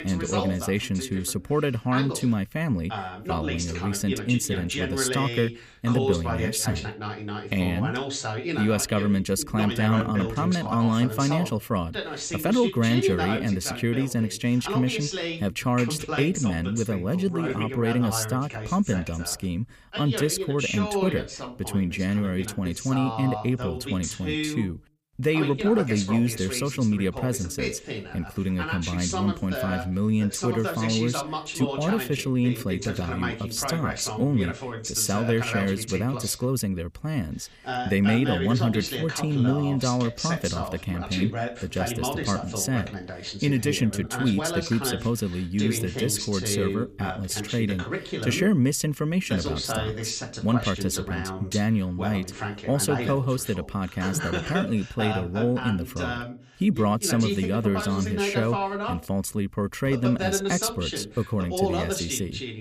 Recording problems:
voice in the background; loud; throughout; 5 dB below the speech

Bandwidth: 15 kHz